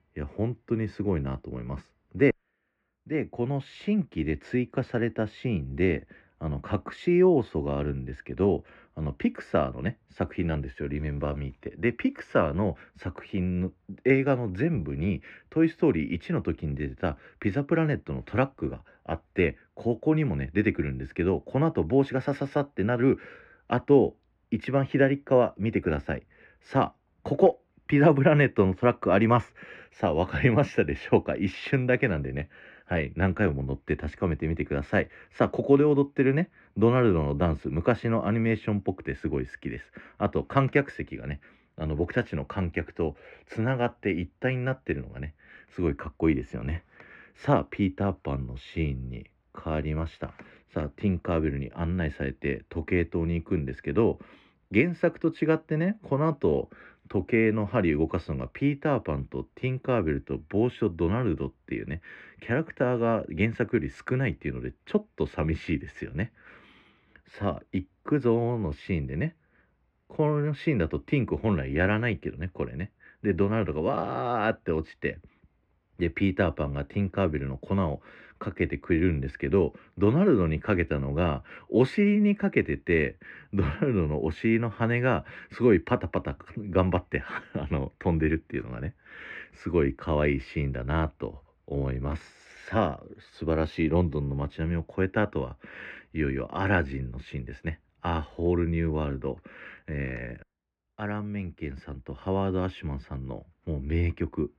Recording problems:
muffled; very; fading above 2 kHz

